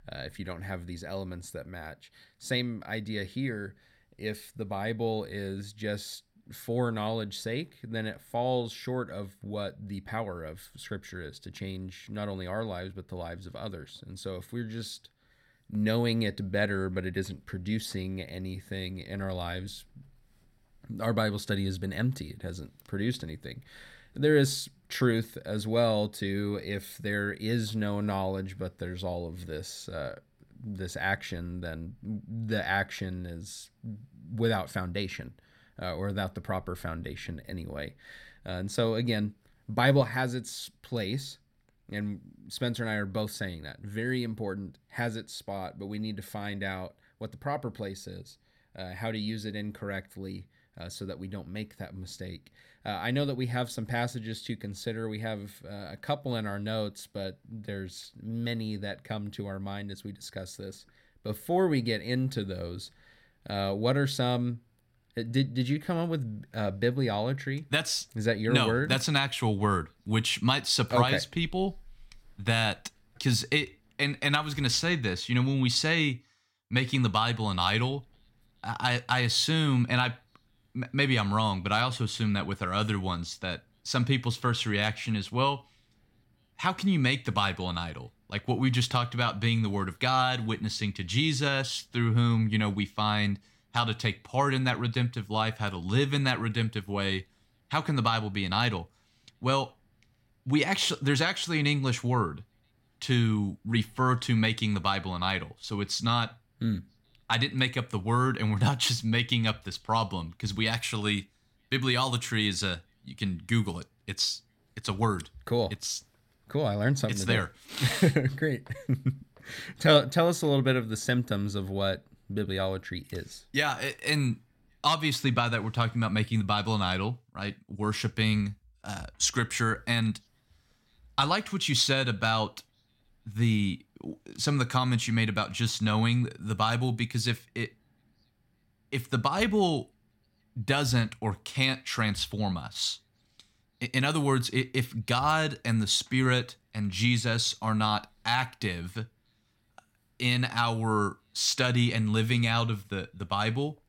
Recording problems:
none

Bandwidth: 16.5 kHz